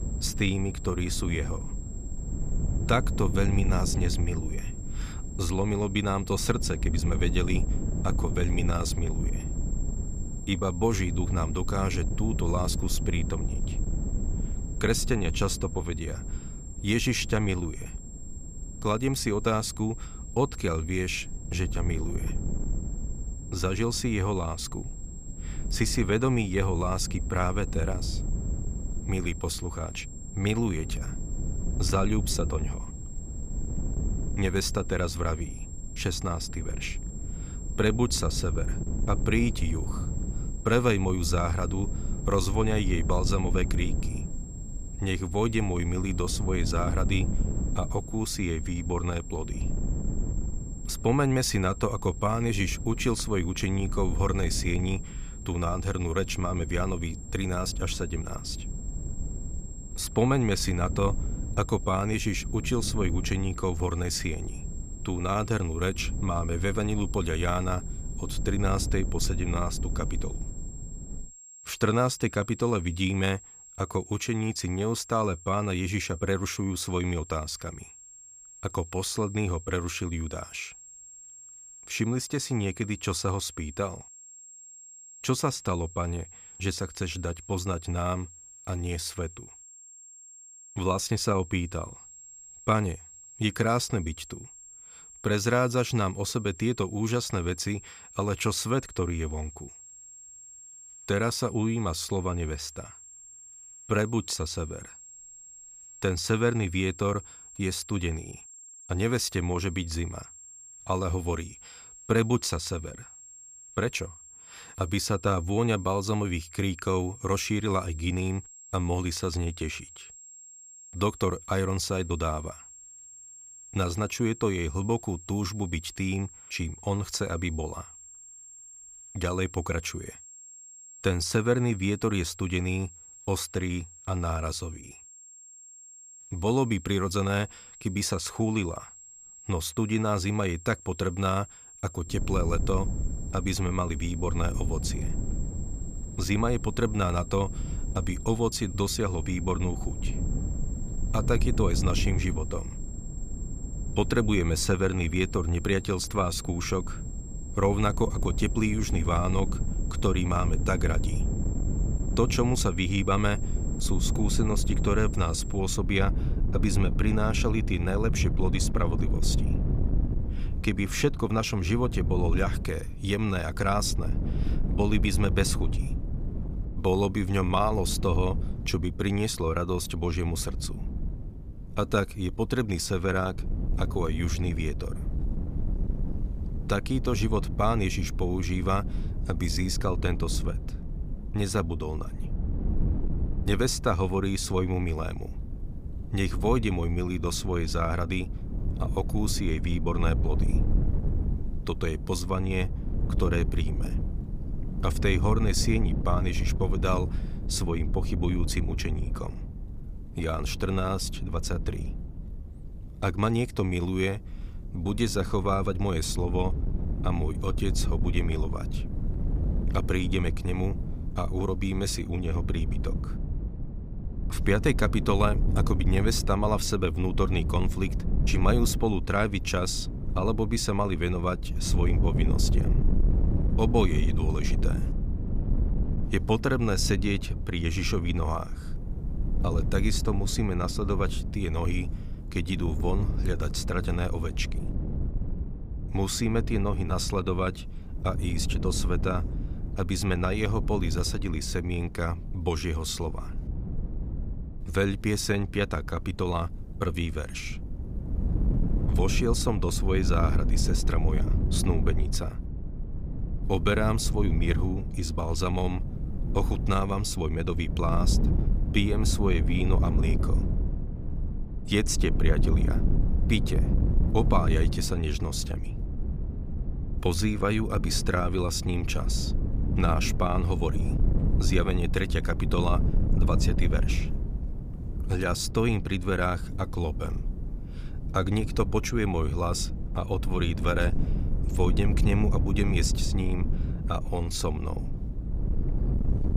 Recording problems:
high-pitched whine; noticeable; until 2:46; 7.5 kHz, 15 dB below the speech
wind noise on the microphone; occasional gusts; until 1:11 and from 2:22 on; 15 dB below the speech

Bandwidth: 15 kHz